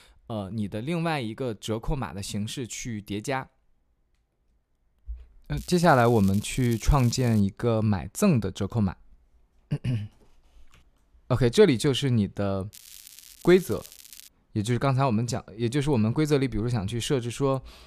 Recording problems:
crackling; noticeable; from 5.5 to 7.5 s and from 13 to 14 s; 20 dB below the speech

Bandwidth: 14.5 kHz